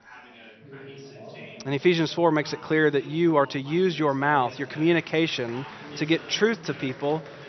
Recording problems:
high frequencies cut off; noticeable; nothing above 6 kHz
chatter from many people; noticeable; throughout; 20 dB below the speech

